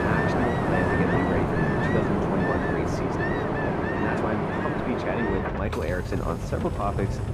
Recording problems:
muffled; slightly; fading above 2.5 kHz
rain or running water; very loud; throughout; 5 dB above the speech
hiss; faint; until 3 s and from 4.5 s on; 20 dB below the speech
traffic noise; very faint; throughout; 20 dB below the speech

